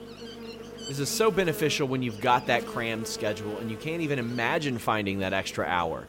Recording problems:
electrical hum; noticeable; throughout; 50 Hz, 15 dB below the speech

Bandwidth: 16 kHz